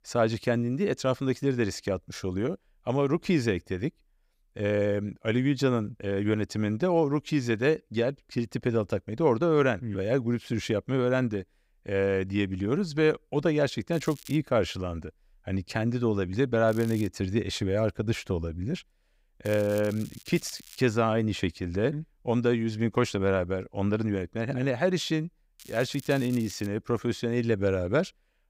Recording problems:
crackling; noticeable; 4 times, first at 14 s; 20 dB below the speech

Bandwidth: 15.5 kHz